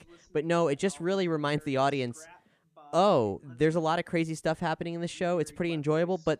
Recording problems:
voice in the background; faint; throughout; 25 dB below the speech

